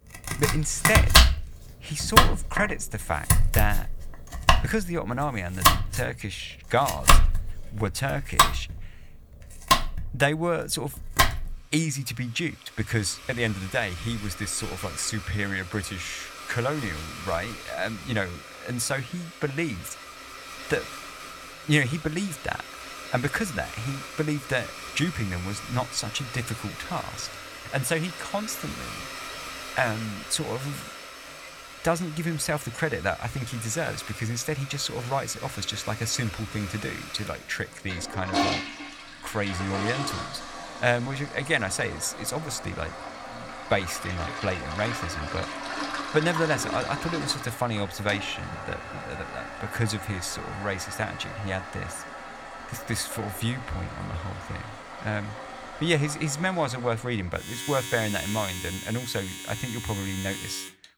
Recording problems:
household noises; loud; throughout; 1 dB below the speech

